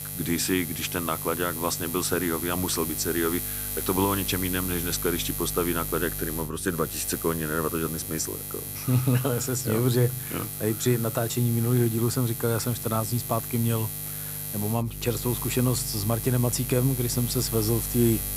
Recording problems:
electrical hum; loud; throughout; 50 Hz, 7 dB below the speech

